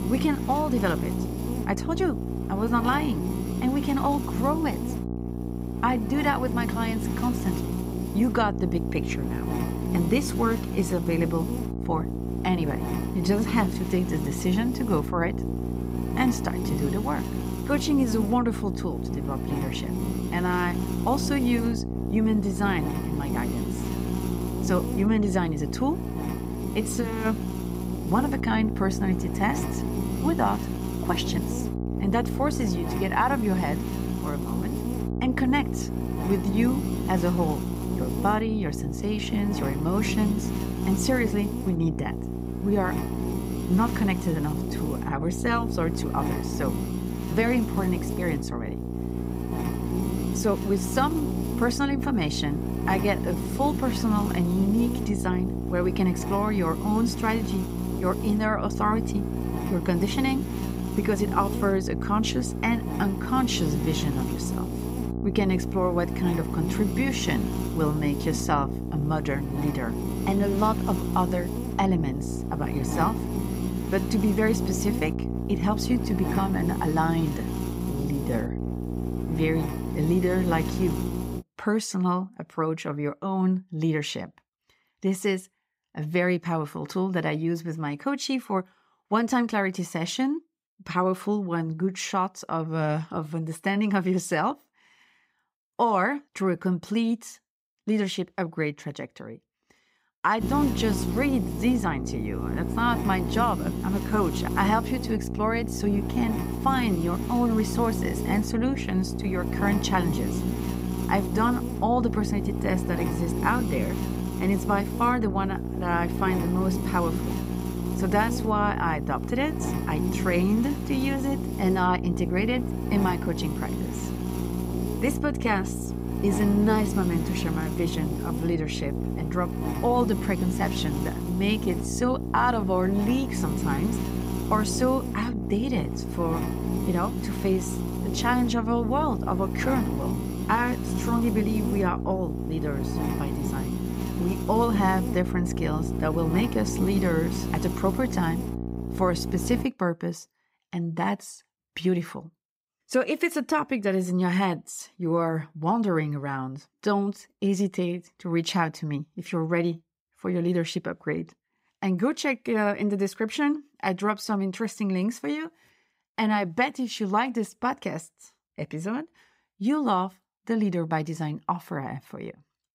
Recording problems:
electrical hum; loud; until 1:21 and from 1:40 to 2:30; 60 Hz, 7 dB below the speech

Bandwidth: 15.5 kHz